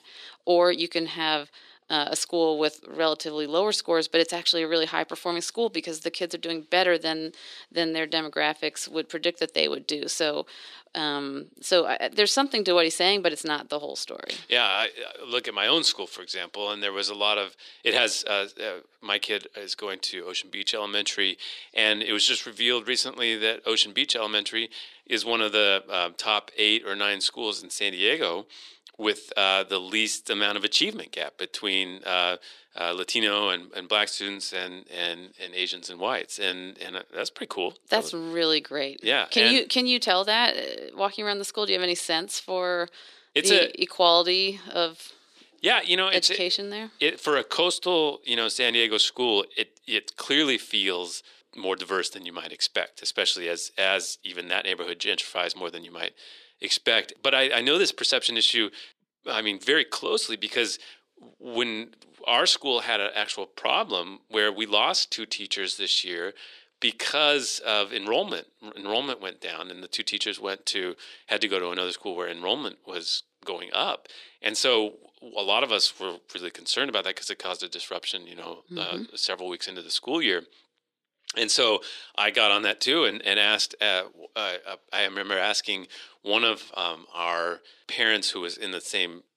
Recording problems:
thin; very; fading below 300 Hz

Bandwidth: 14 kHz